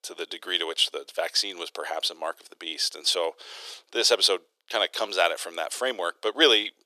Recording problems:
thin; very; fading below 350 Hz

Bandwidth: 14 kHz